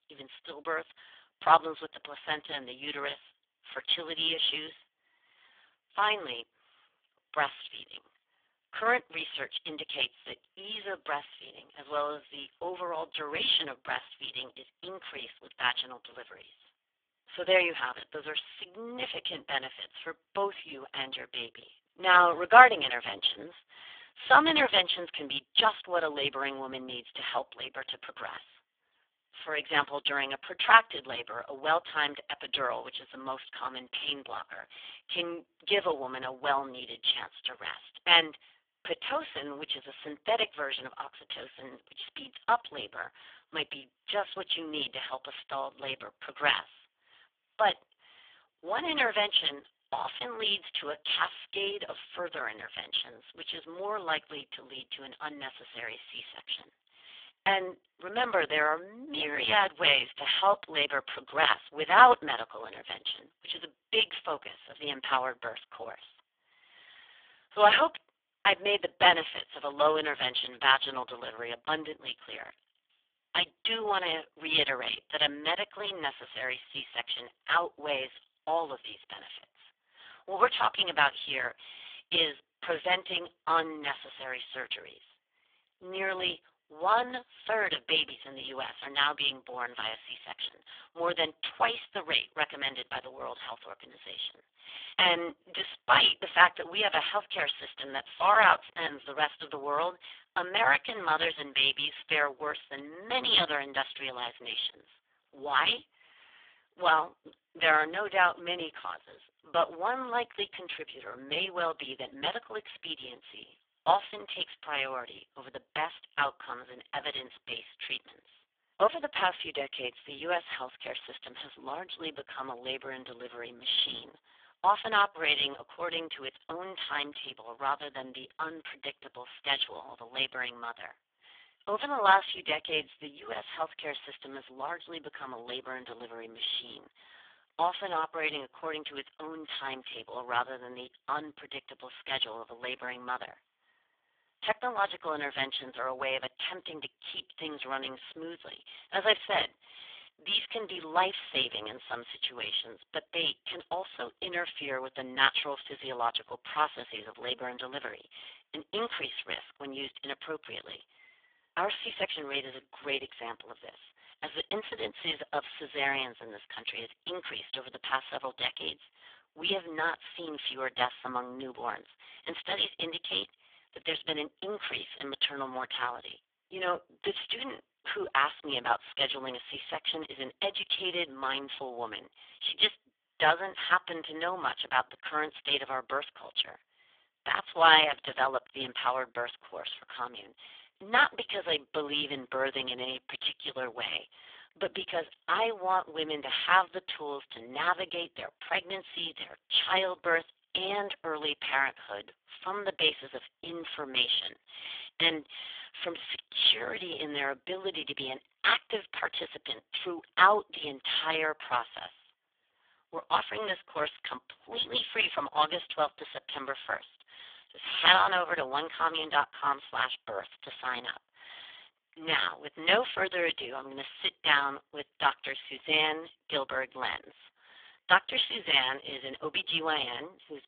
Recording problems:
phone-call audio; poor line; nothing above 3.5 kHz
thin; very; fading below 900 Hz

